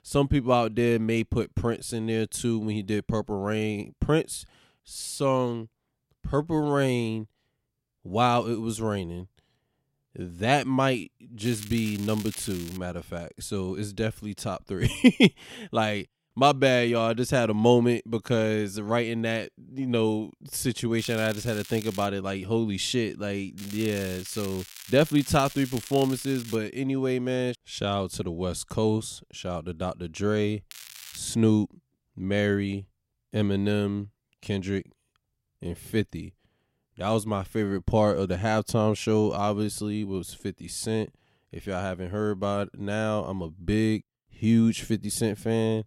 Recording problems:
crackling; noticeable; 4 times, first at 11 s; 15 dB below the speech

